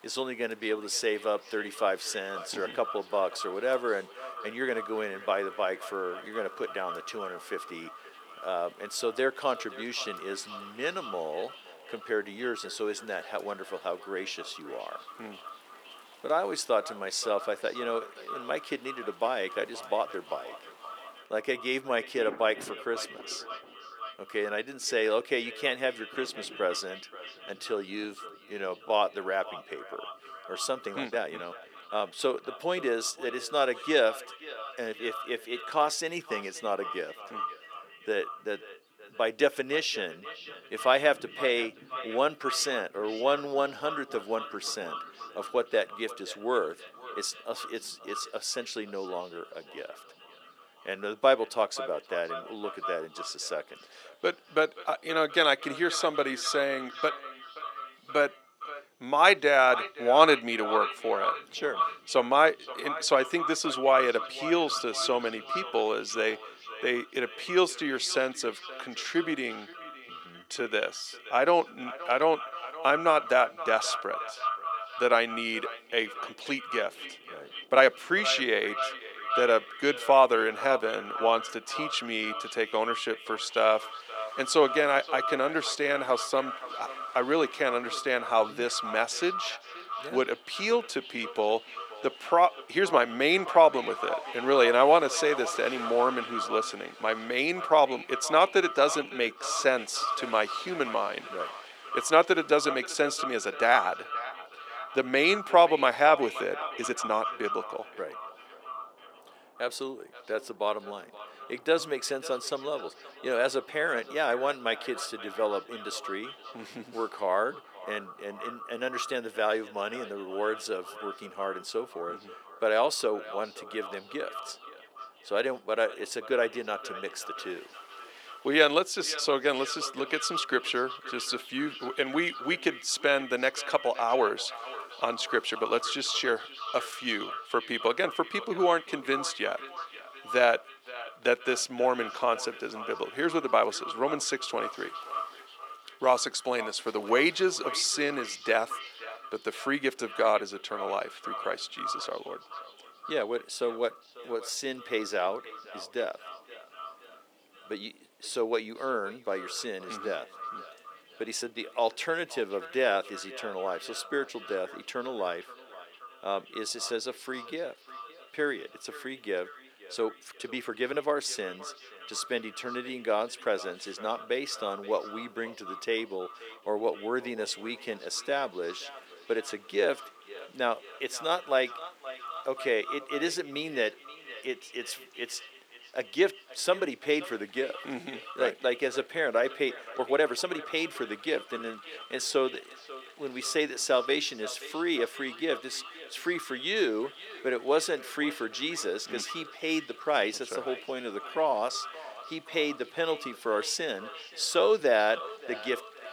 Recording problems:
echo of what is said; strong; throughout; 530 ms later, 10 dB below the speech
thin; somewhat; fading below 350 Hz
rain or running water; faint; throughout; 25 dB below the speech
uneven, jittery; strongly; from 28 s to 3:25

